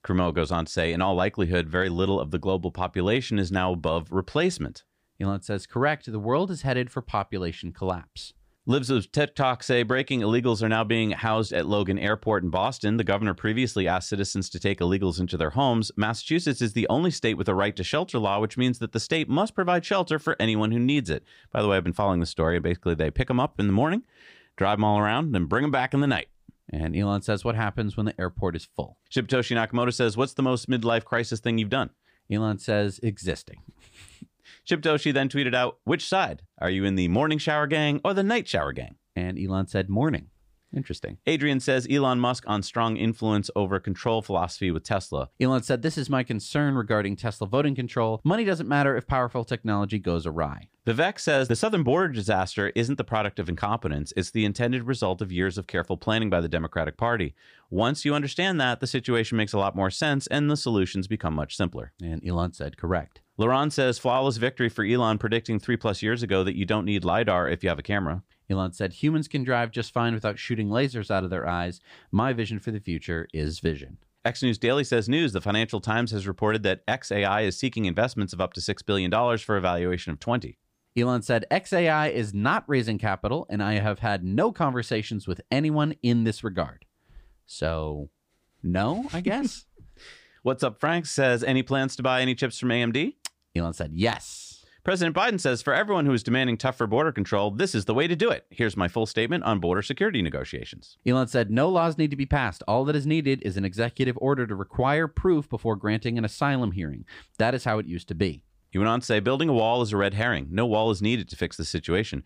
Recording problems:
none

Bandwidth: 15 kHz